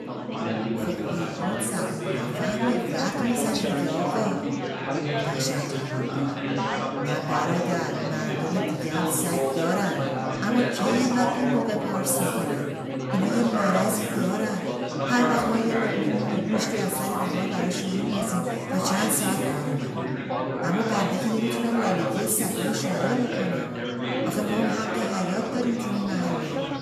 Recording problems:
off-mic speech; far
room echo; noticeable; dies away in 1.3 s
chatter from many people; very loud; throughout; as loud as the speech

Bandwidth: 13.5 kHz